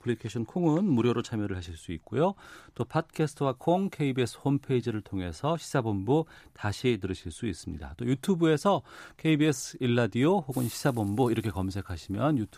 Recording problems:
hiss; very faint; from 3.5 s on; 20 dB below the speech

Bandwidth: 15 kHz